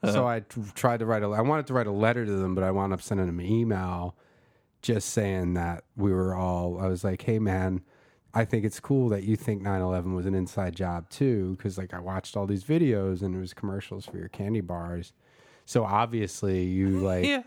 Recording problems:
none

